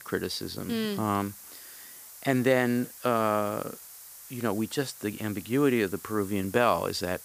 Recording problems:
hiss; noticeable; throughout; 15 dB below the speech

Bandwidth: 15 kHz